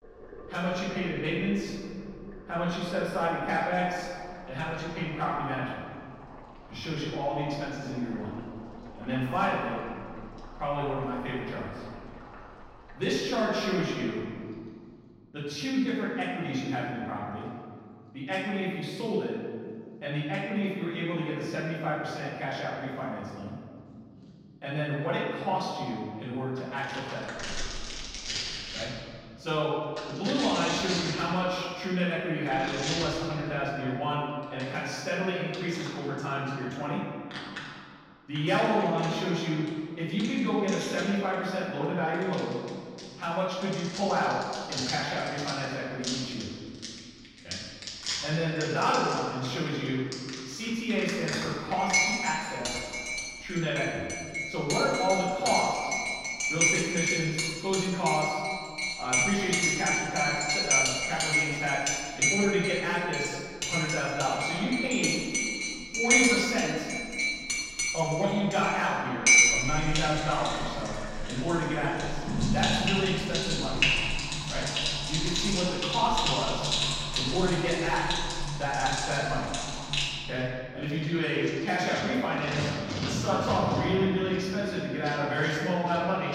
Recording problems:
room echo; strong; dies away in 1.9 s
off-mic speech; far
household noises; very loud; throughout; 1 dB above the speech

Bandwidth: 16 kHz